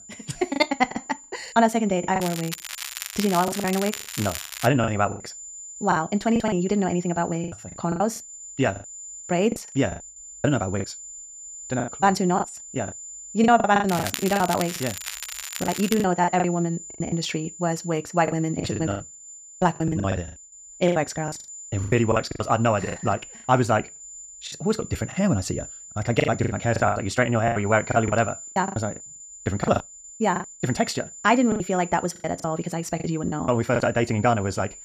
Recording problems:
wrong speed, natural pitch; too fast; 1.7 times normal speed
crackling; loud; from 2 to 4.5 s and from 14 to 16 s; 8 dB below the speech
high-pitched whine; noticeable; throughout; 7 kHz, 15 dB below the speech
choppy; very; 14% of the speech affected

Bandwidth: 15 kHz